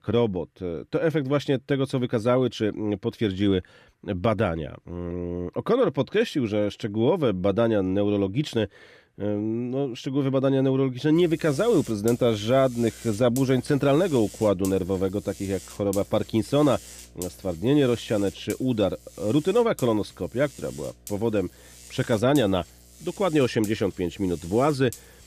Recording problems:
electrical hum; noticeable; from 11 s on; 60 Hz, 20 dB below the speech

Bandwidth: 14.5 kHz